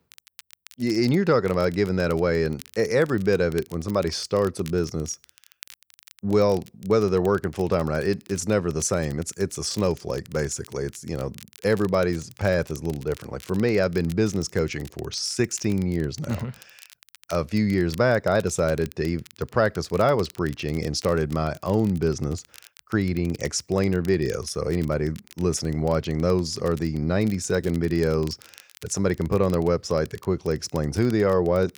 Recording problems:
crackle, like an old record; faint; 25 dB below the speech

